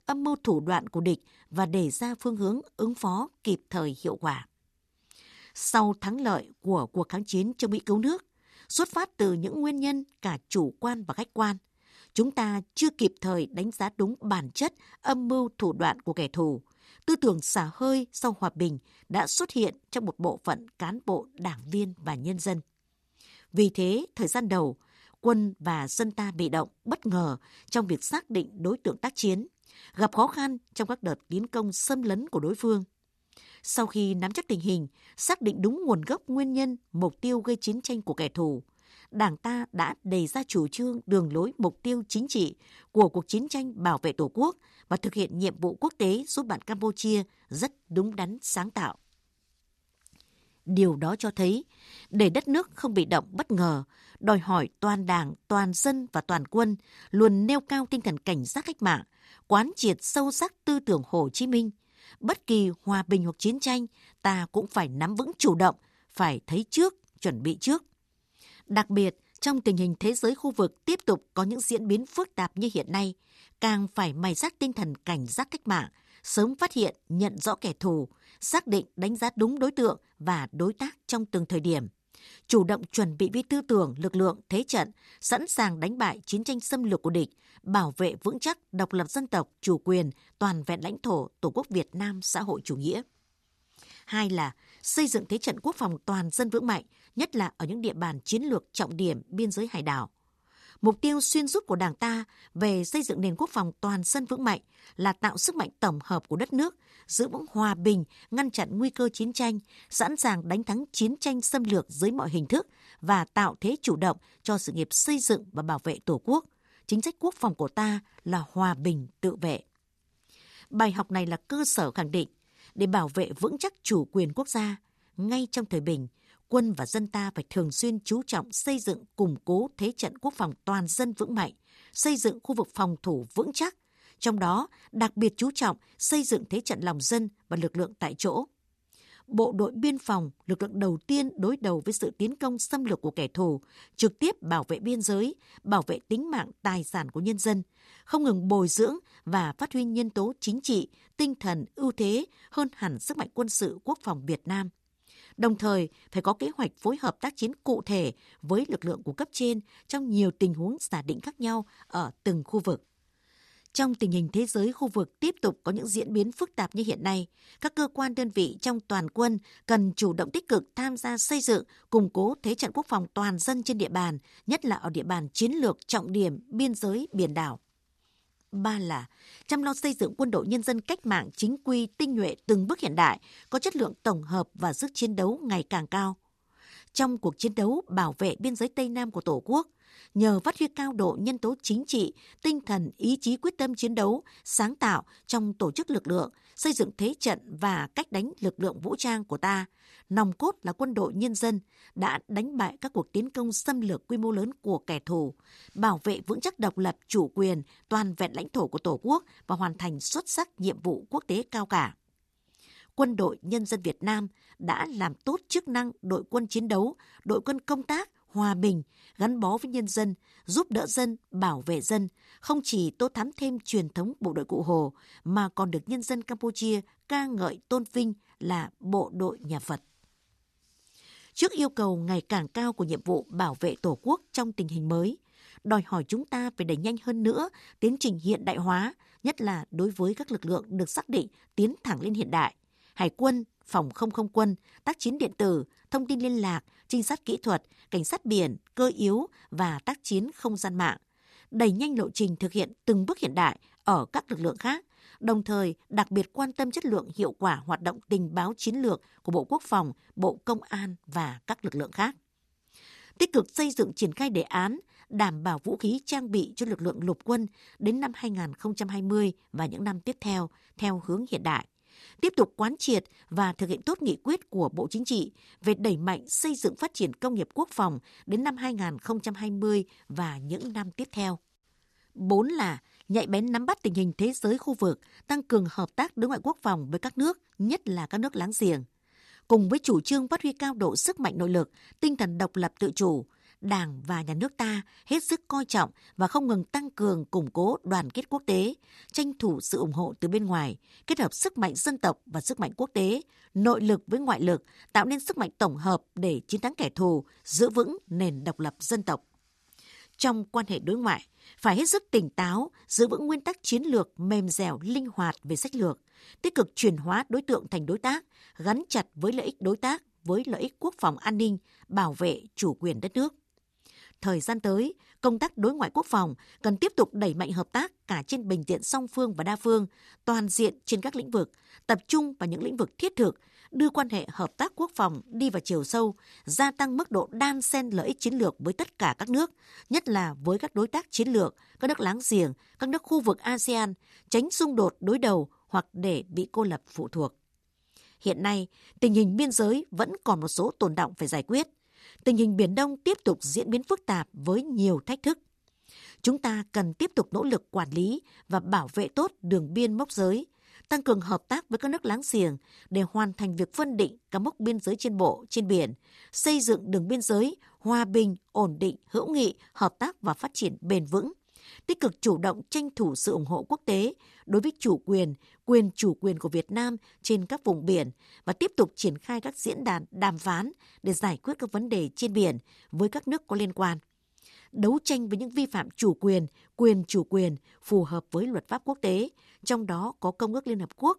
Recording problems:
none

